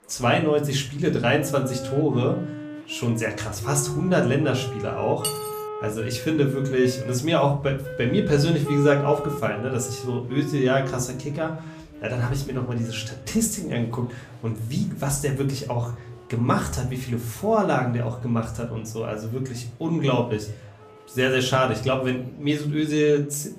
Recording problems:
room echo; slight; dies away in 0.4 s
off-mic speech; somewhat distant
background music; noticeable; throughout; 10 dB below the speech
murmuring crowd; faint; throughout; 30 dB below the speech
clattering dishes; noticeable; at 5 s; peak 5 dB below the speech

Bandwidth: 14.5 kHz